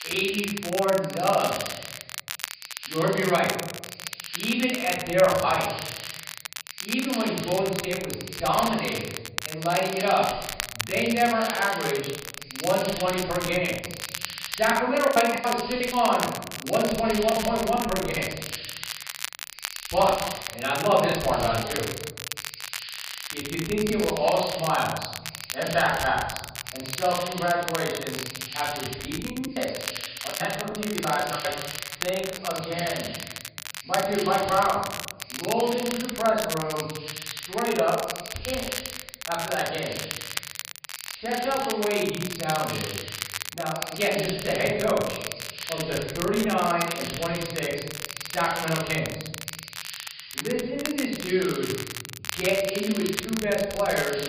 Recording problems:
off-mic speech; far
high frequencies cut off; severe; nothing above 5 kHz
room echo; noticeable; dies away in 0.9 s
crackle, like an old record; loud; 8 dB below the speech
hiss; noticeable; throughout; 15 dB below the speech
choppy; very; from 14 to 18 s, from 20 to 21 s and from 29 to 31 s; 13% of the speech affected

